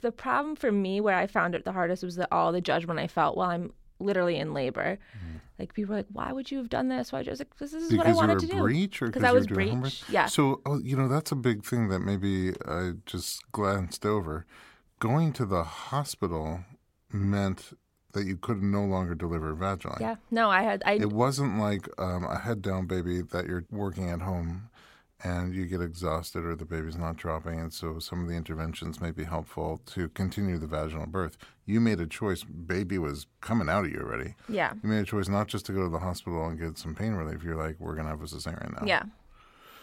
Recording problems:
none

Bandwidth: 16.5 kHz